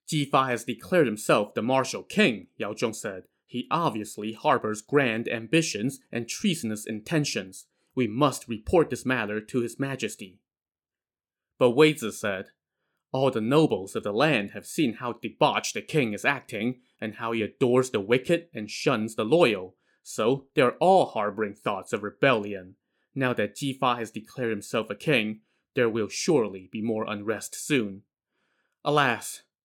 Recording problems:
none

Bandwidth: 17.5 kHz